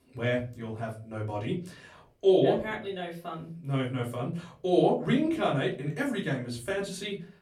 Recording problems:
off-mic speech; far
room echo; very slight; dies away in 0.3 s

